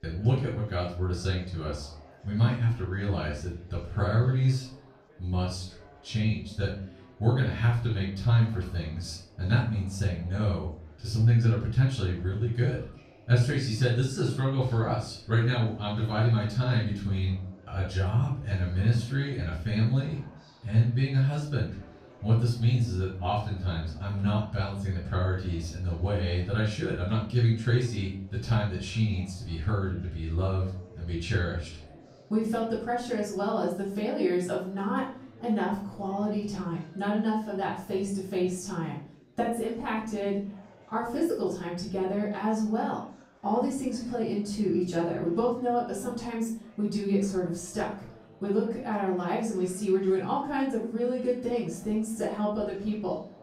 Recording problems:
off-mic speech; far
room echo; noticeable; dies away in 0.4 s
chatter from many people; faint; throughout; 25 dB below the speech

